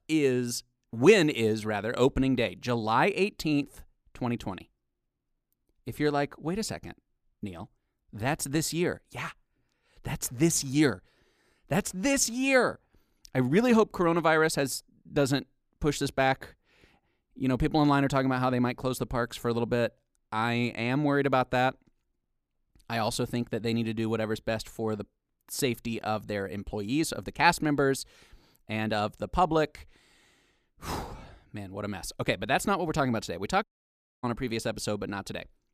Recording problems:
audio cutting out; at 34 s for 0.5 s

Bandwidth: 14.5 kHz